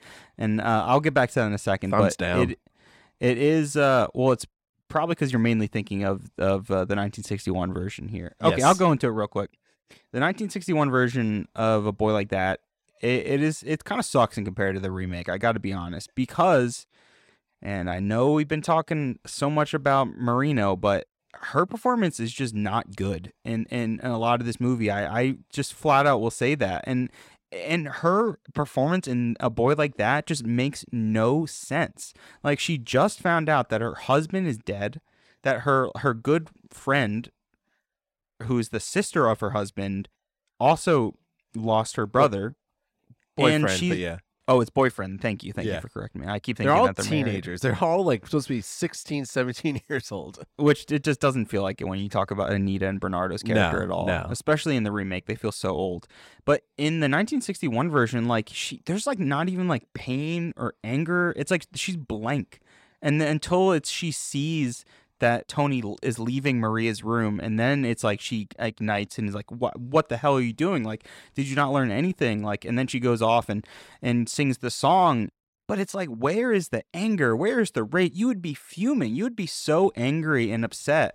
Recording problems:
none

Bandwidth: 16 kHz